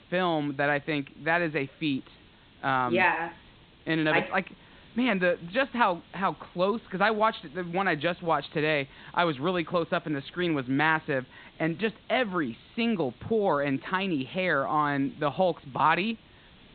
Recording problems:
high frequencies cut off; severe; nothing above 4 kHz
hiss; faint; throughout; 25 dB below the speech

